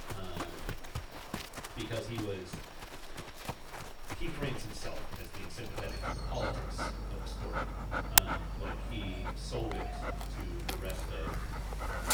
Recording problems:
off-mic speech; far
echo of what is said; noticeable; from 4 s on; 110 ms later, 15 dB below the speech
room echo; very slight; dies away in 0.3 s
animal sounds; very loud; throughout; 6 dB above the speech
high-pitched whine; faint; throughout; 5.5 kHz, 25 dB below the speech

